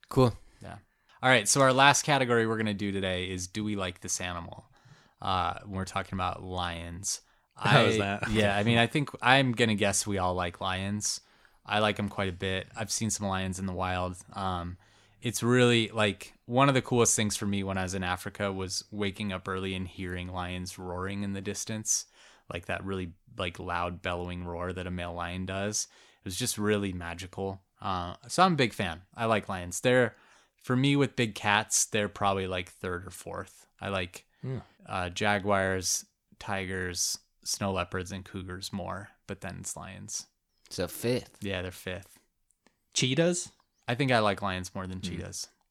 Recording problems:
none

